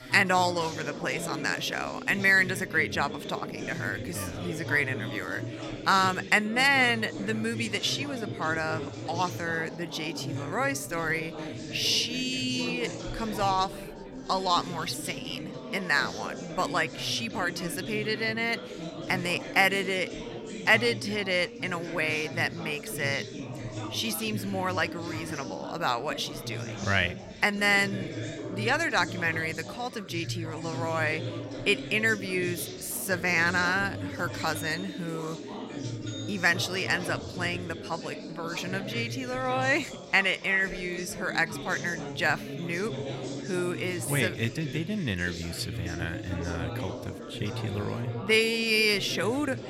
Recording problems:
background chatter; loud; throughout; 4 voices, 9 dB below the speech

